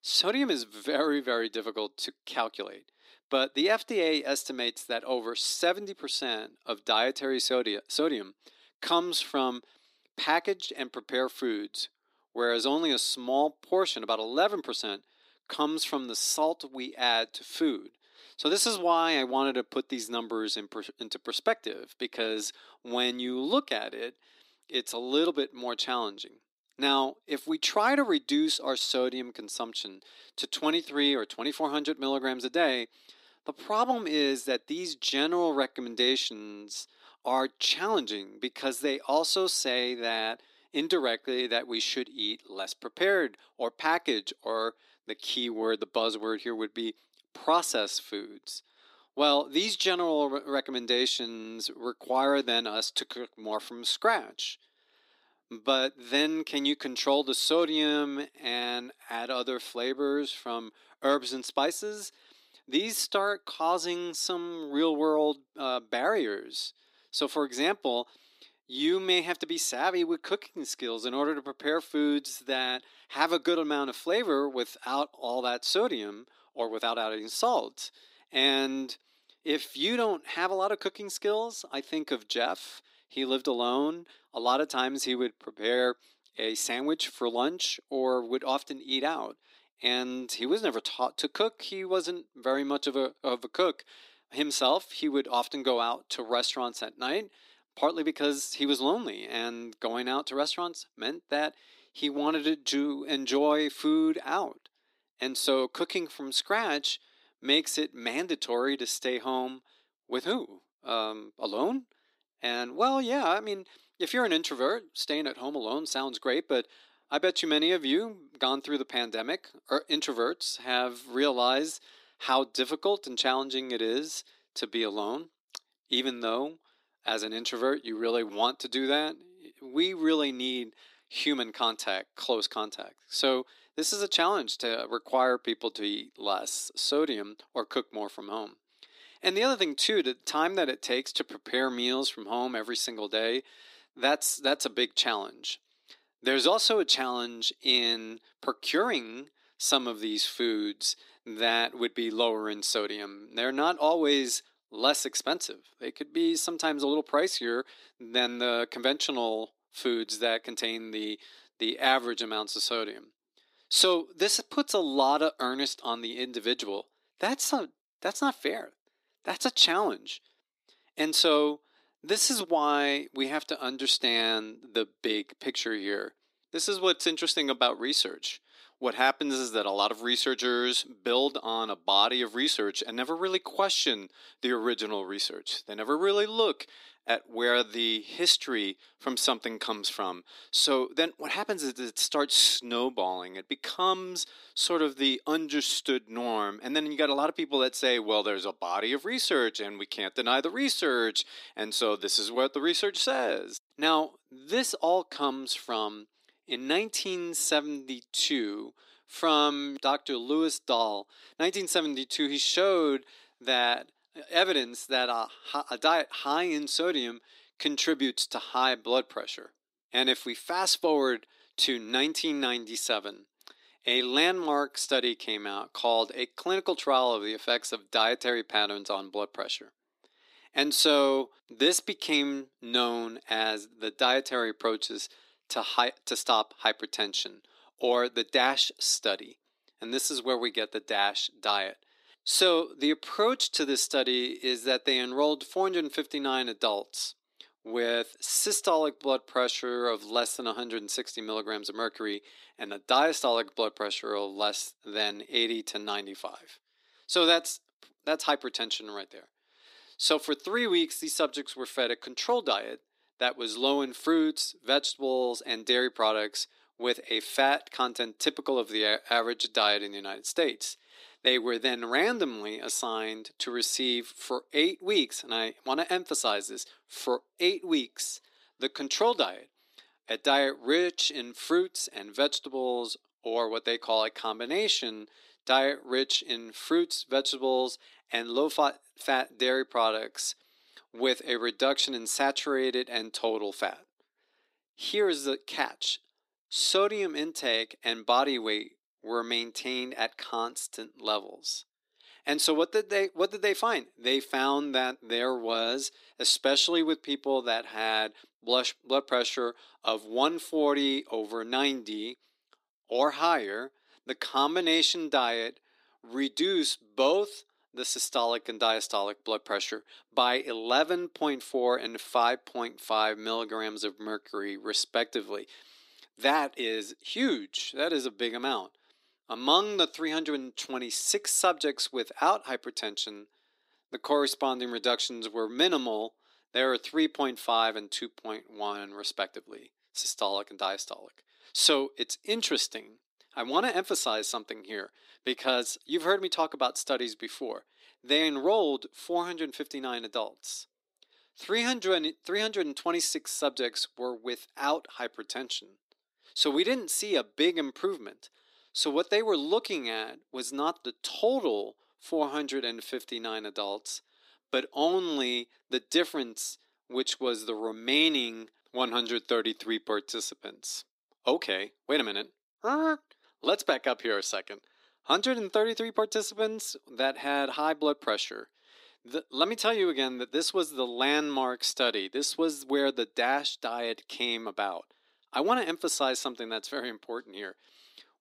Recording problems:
thin; somewhat; fading below 300 Hz

